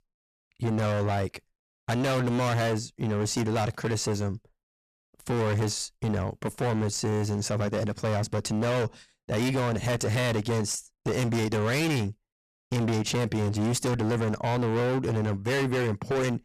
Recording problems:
distortion; heavy; 31% of the sound clipped

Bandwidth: 14.5 kHz